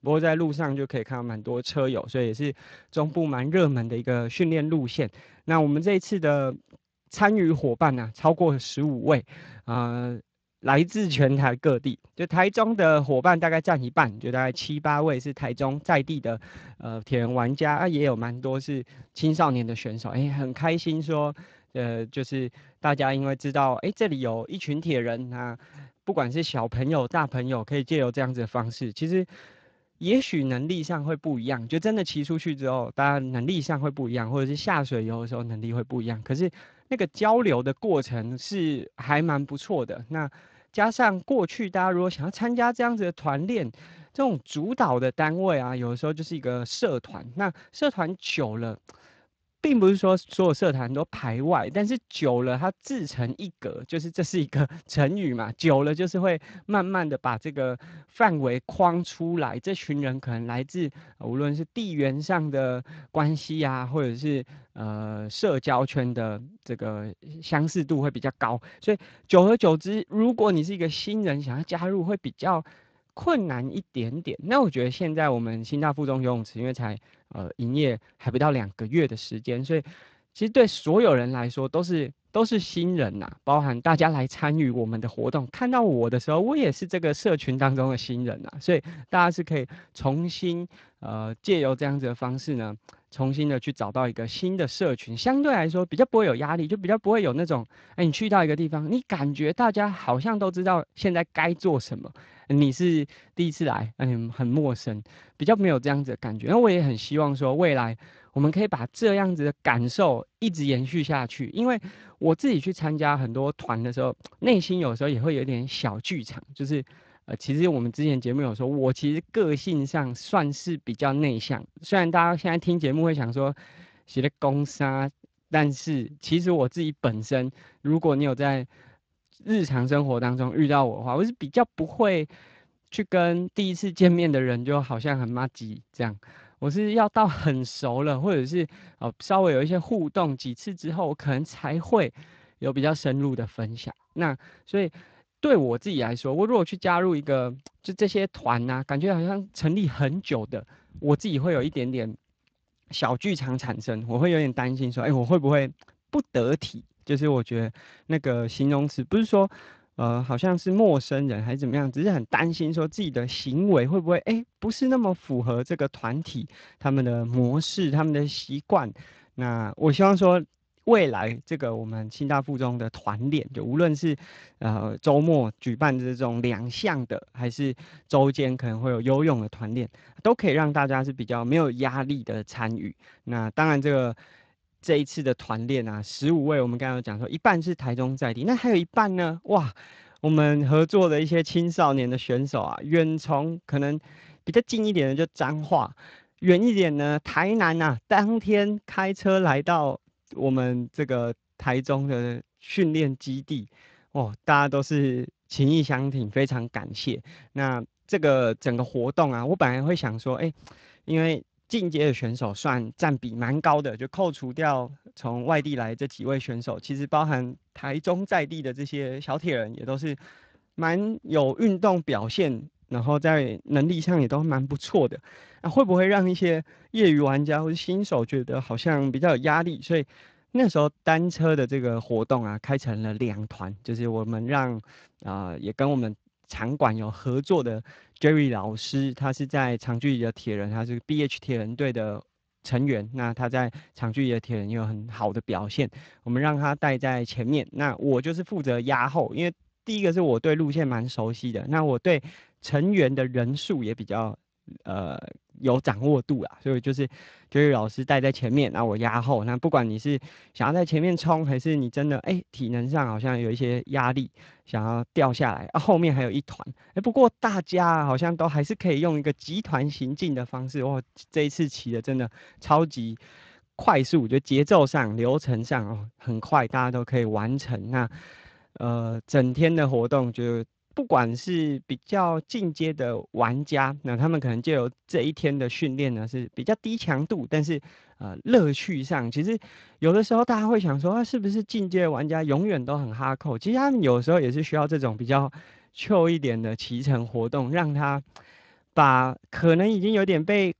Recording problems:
garbled, watery; slightly

